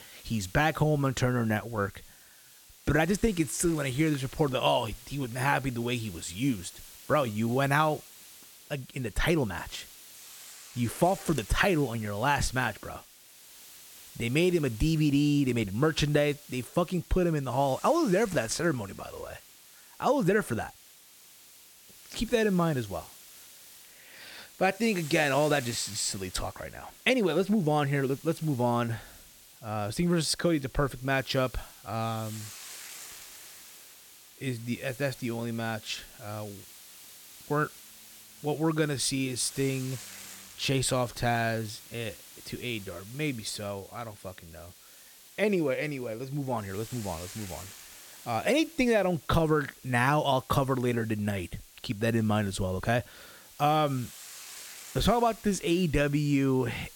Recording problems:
hiss; noticeable; throughout; 20 dB below the speech

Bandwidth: 17 kHz